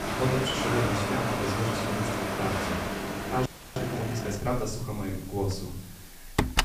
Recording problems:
off-mic speech; far
room echo; slight; dies away in 0.5 s
household noises; loud; throughout; 3 dB below the speech
rain or running water; loud; until 3.5 s; 1 dB below the speech
hiss; noticeable; throughout; 15 dB below the speech
audio freezing; at 3.5 s

